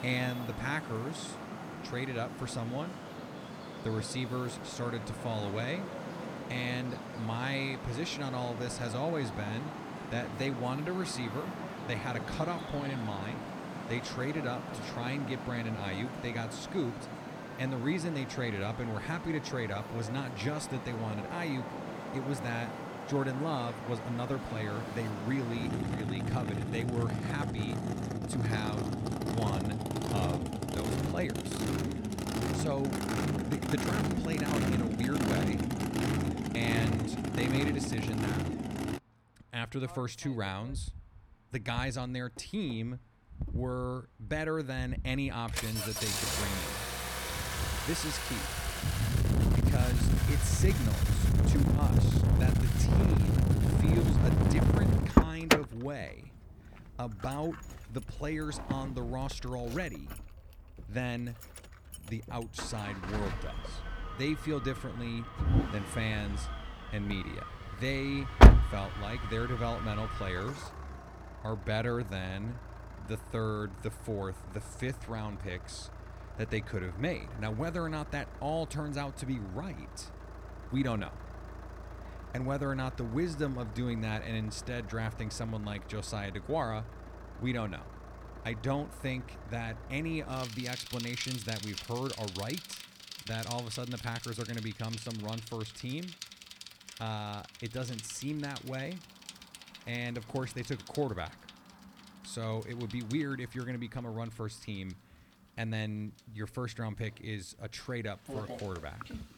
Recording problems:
traffic noise; very loud; throughout; 4 dB above the speech

